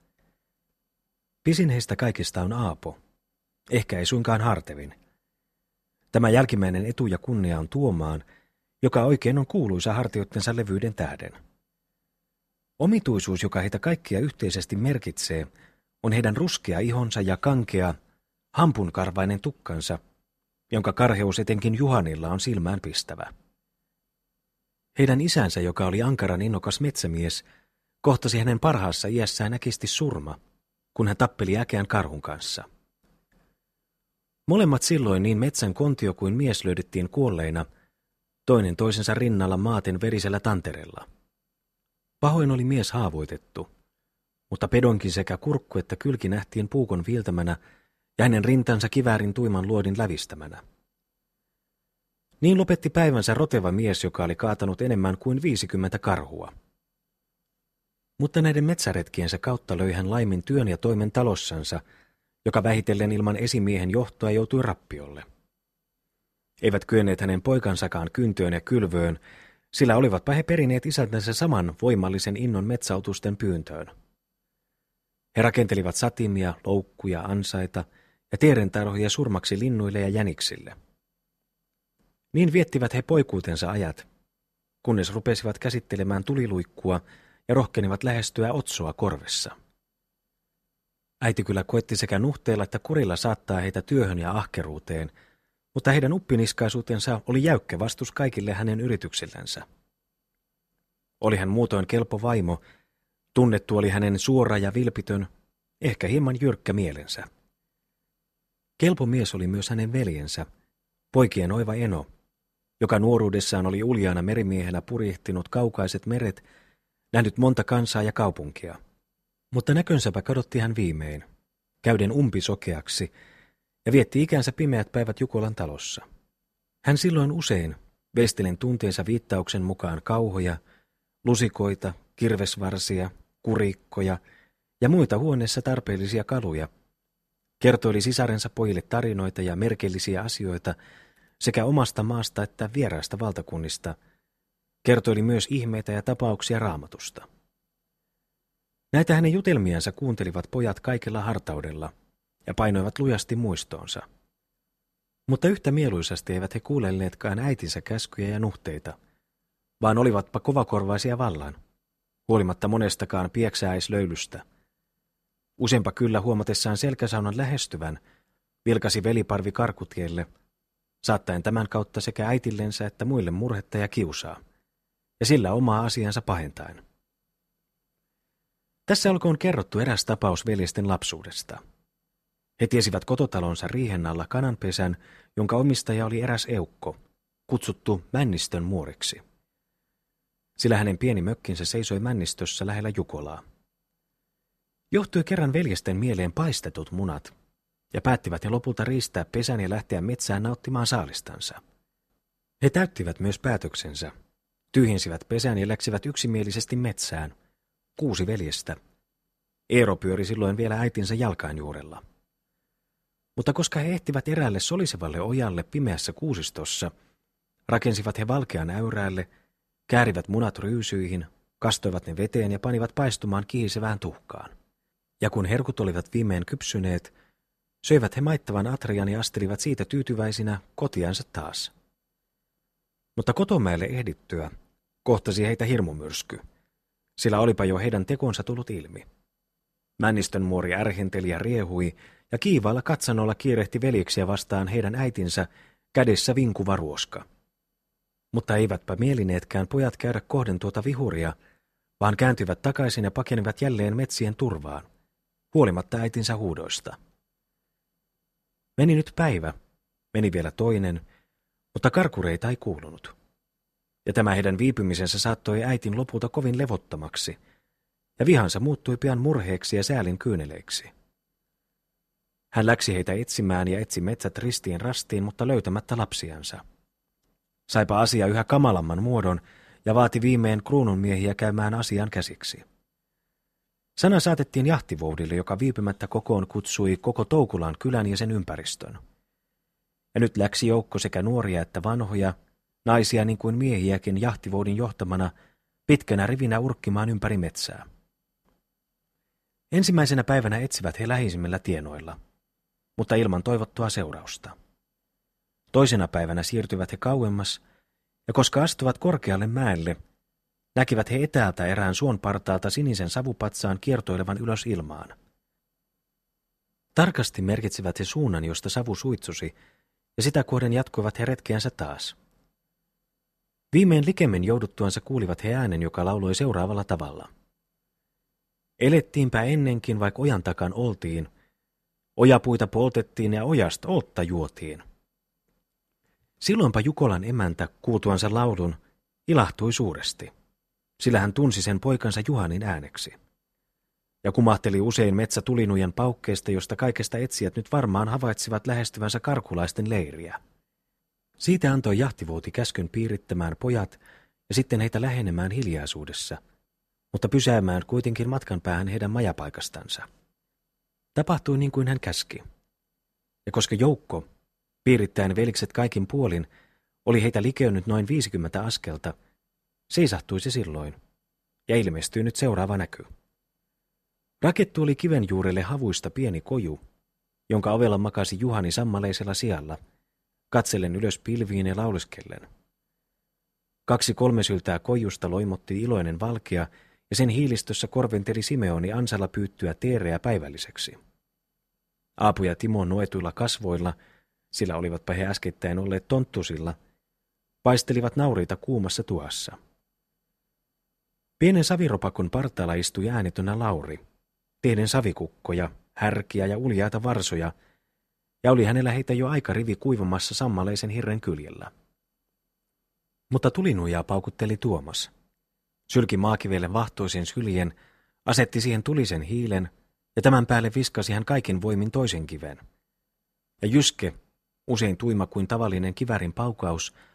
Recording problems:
none

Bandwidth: 13.5 kHz